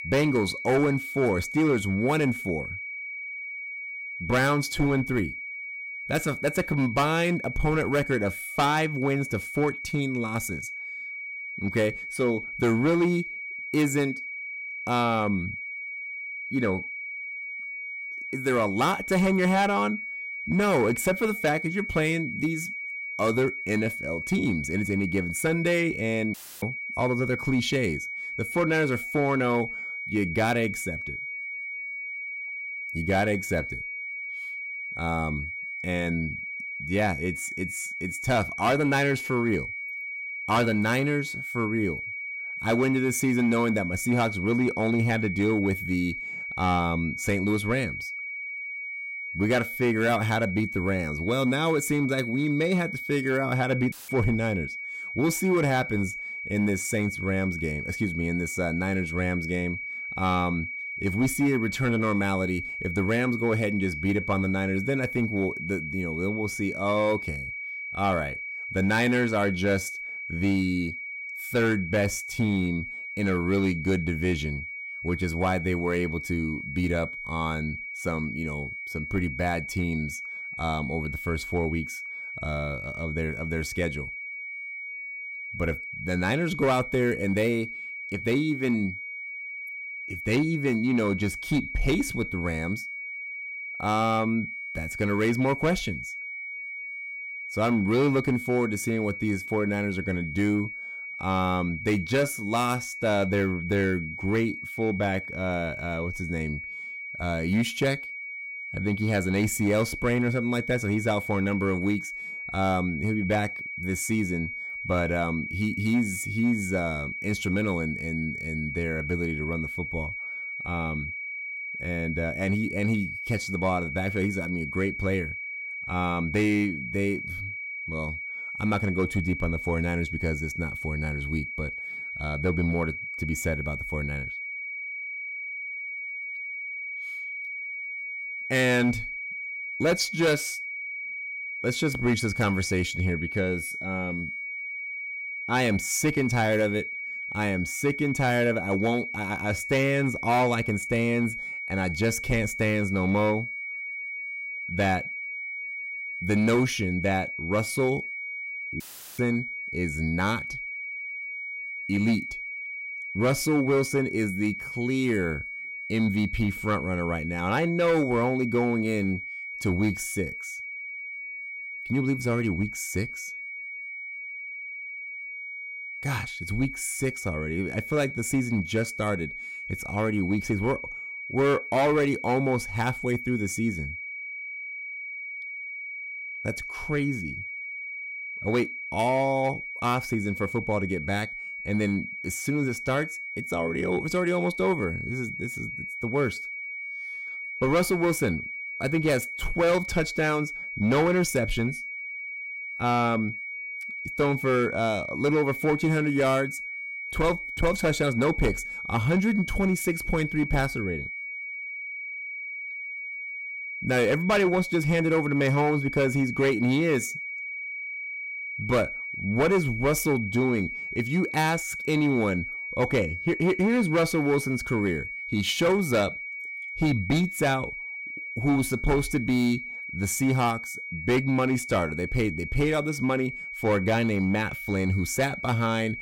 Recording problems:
distortion; slight; 4% of the sound clipped
high-pitched whine; loud; throughout; 2.5 kHz, 6 dB below the speech
audio cutting out; filled with static; at 26 s, at 54 s and at 2:39

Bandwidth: 16 kHz